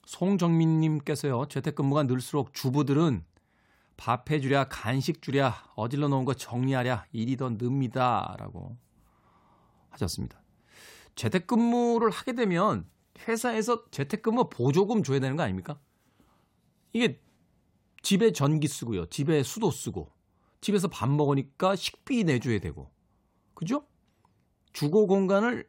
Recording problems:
none

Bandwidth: 16 kHz